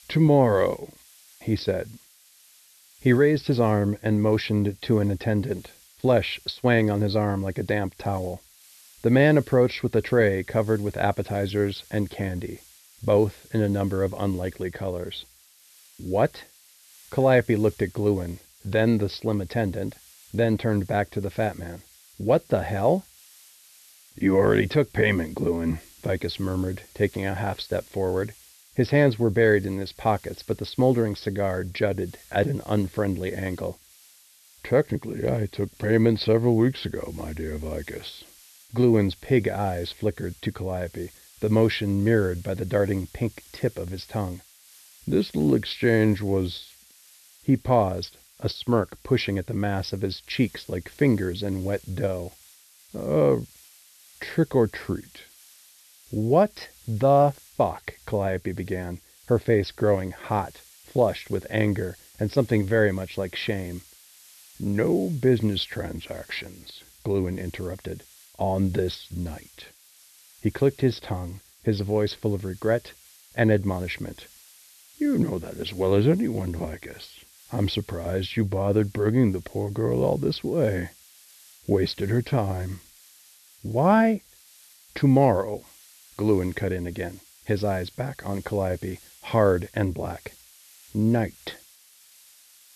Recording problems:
high frequencies cut off; noticeable; nothing above 5.5 kHz
hiss; faint; throughout; 25 dB below the speech

